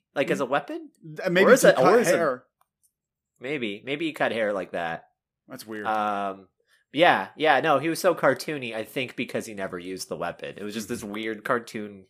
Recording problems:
none

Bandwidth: 15 kHz